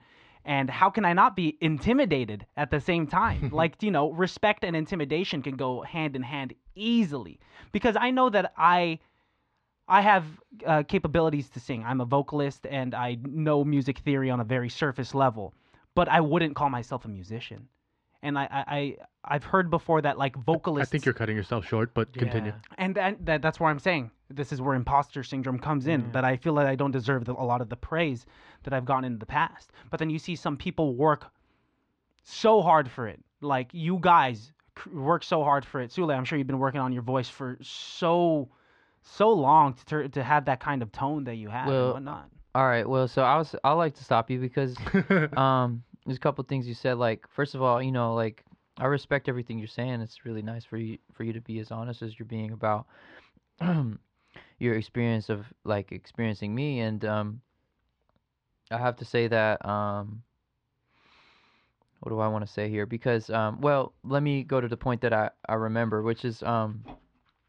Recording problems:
muffled; slightly; fading above 3.5 kHz

